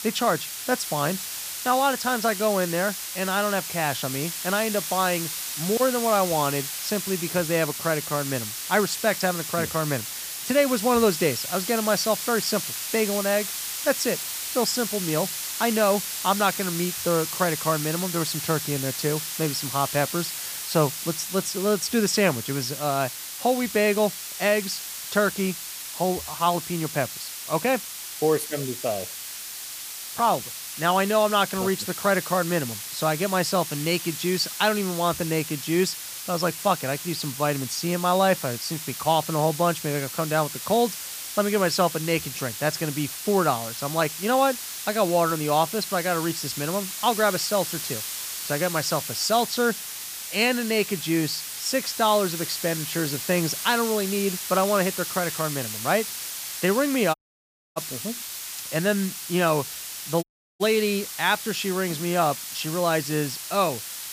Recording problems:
hiss; loud; throughout; 6 dB below the speech
audio cutting out; at 57 s for 0.5 s and at 1:00

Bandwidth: 15 kHz